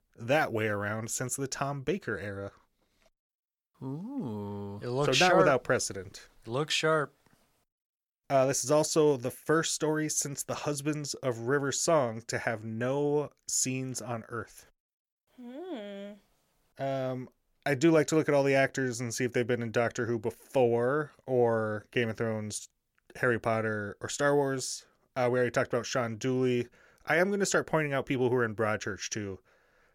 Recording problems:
none

